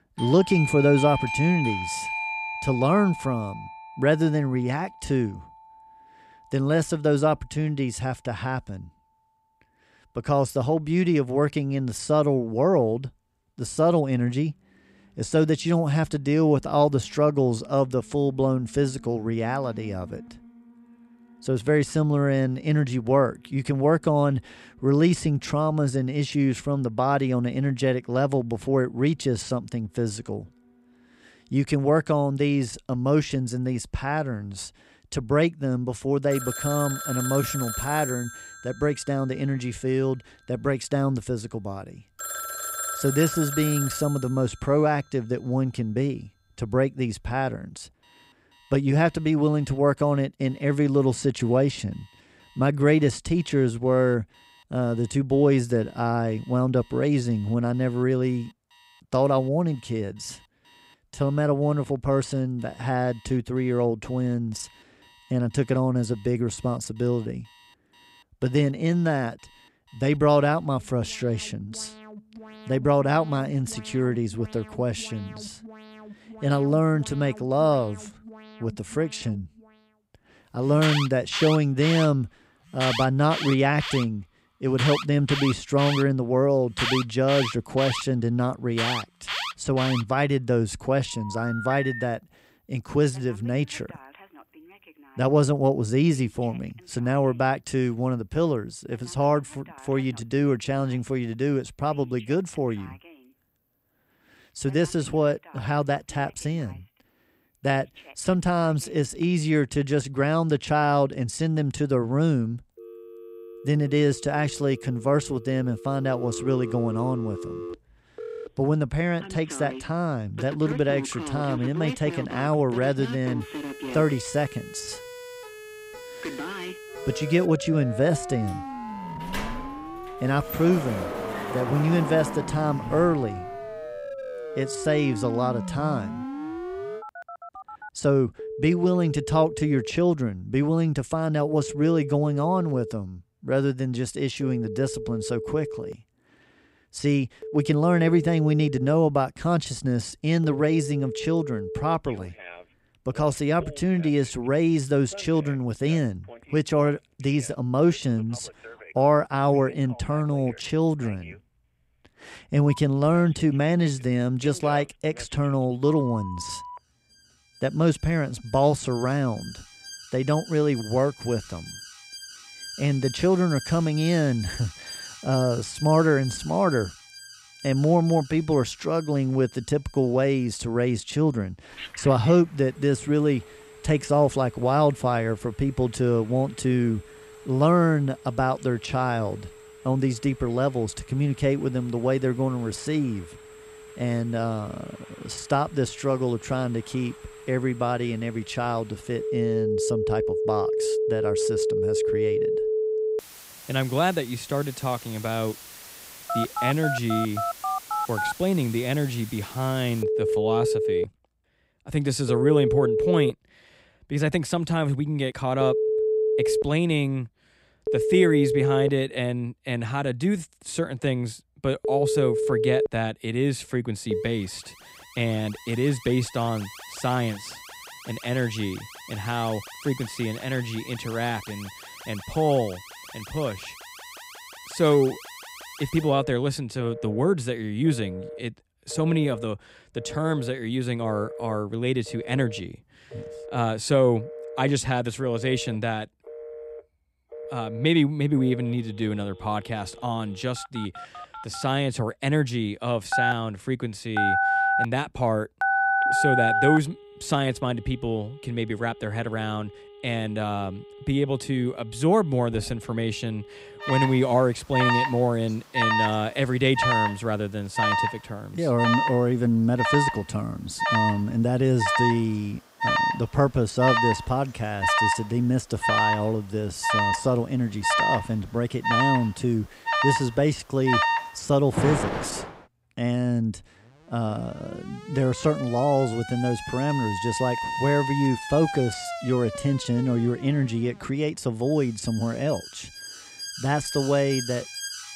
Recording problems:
alarms or sirens; loud; throughout; 6 dB below the speech
siren; faint; from 2:03 to 2:07; peak 15 dB below the speech
door banging; noticeable; from 2:09 to 2:13; peak 7 dB below the speech
phone ringing; loud; from 4:13 to 4:17; peak 4 dB above the speech

